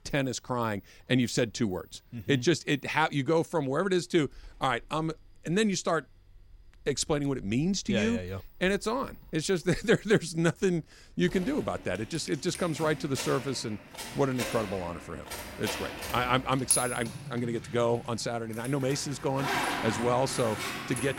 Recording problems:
household noises; loud; throughout; 6 dB below the speech

